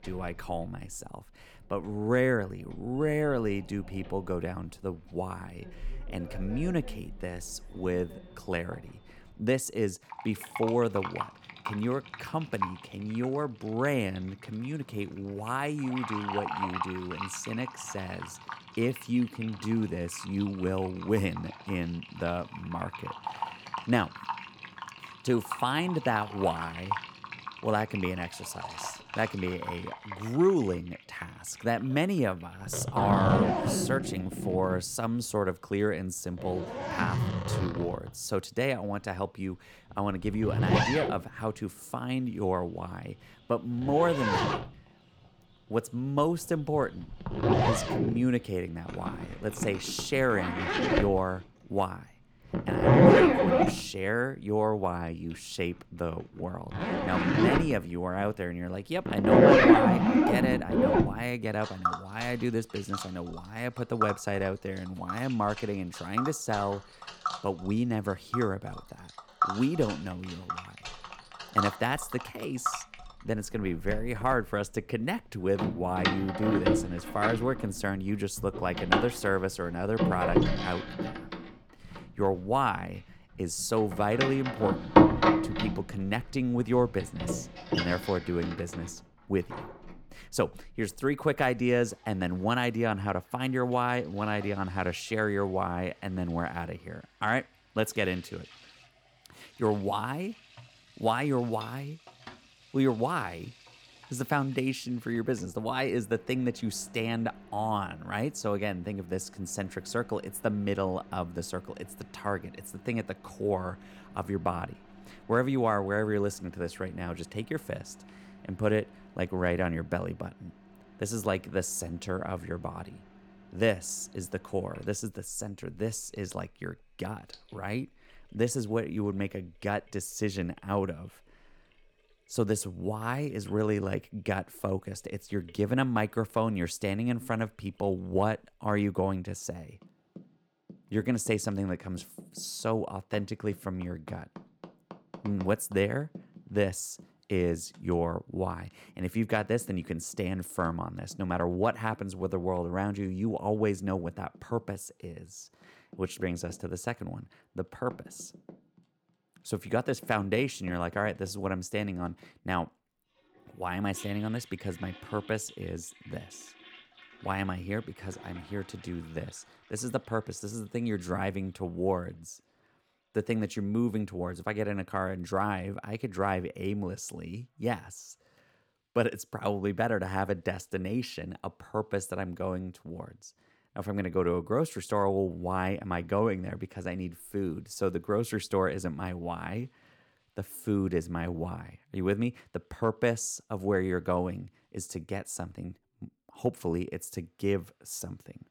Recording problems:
household noises; very loud; throughout; 2 dB above the speech

